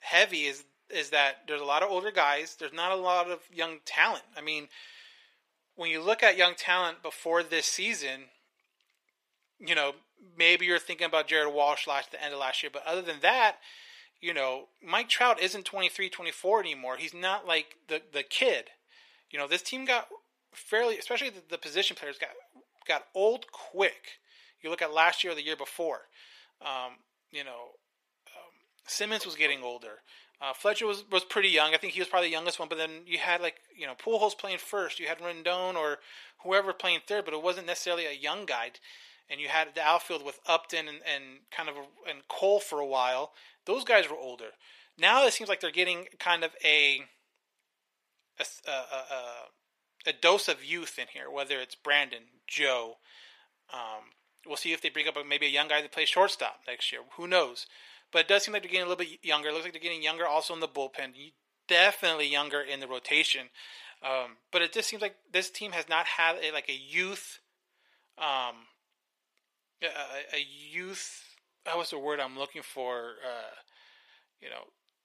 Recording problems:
thin; very; fading below 500 Hz

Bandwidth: 15 kHz